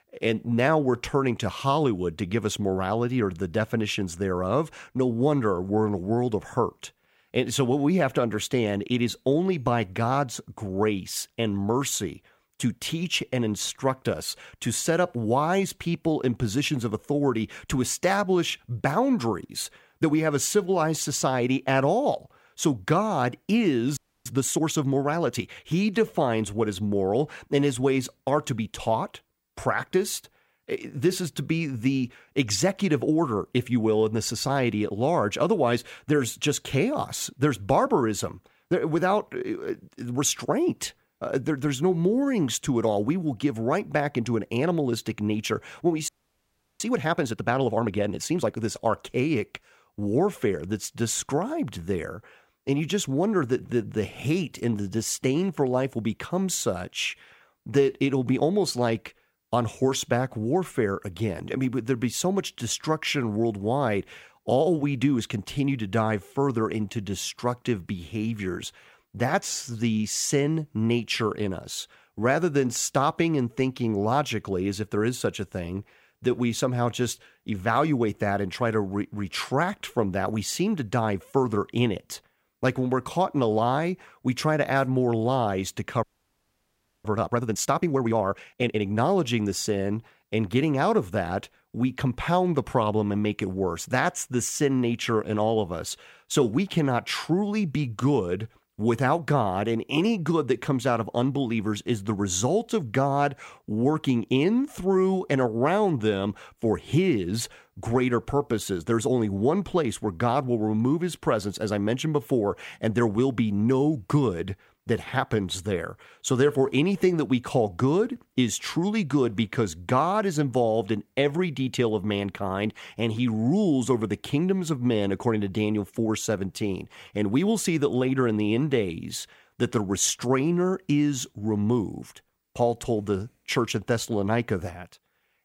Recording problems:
audio freezing; at 24 s, at 46 s for 0.5 s and at 1:26 for 1 s

